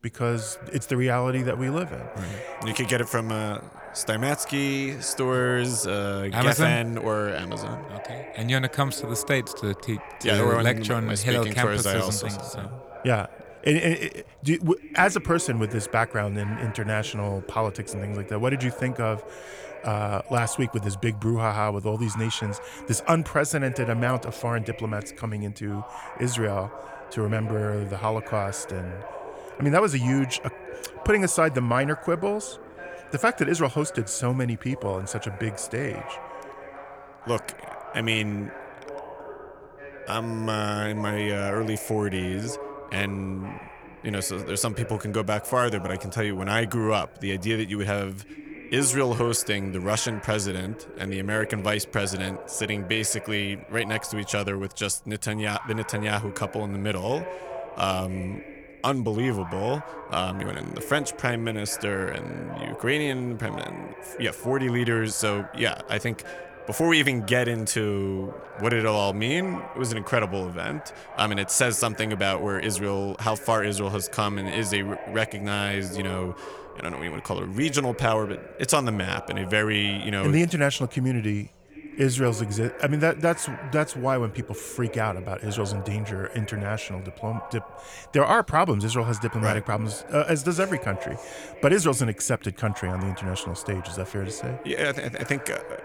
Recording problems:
voice in the background; noticeable; throughout; 15 dB below the speech

